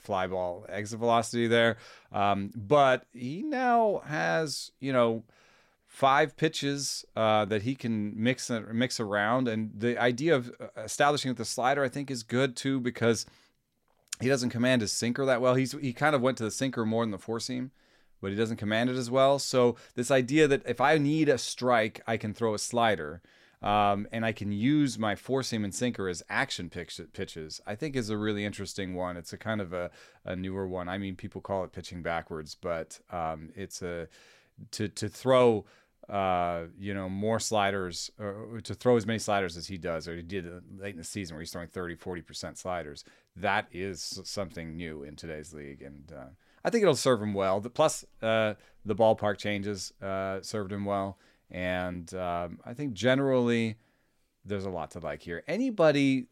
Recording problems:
none

